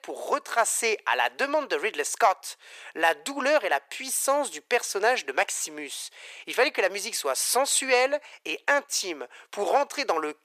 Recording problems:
thin; very; fading below 450 Hz

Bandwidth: 14.5 kHz